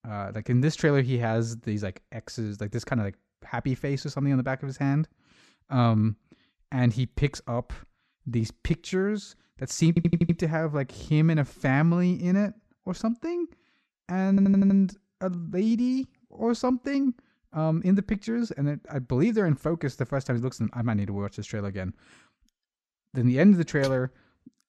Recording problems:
audio stuttering; at 10 s and at 14 s

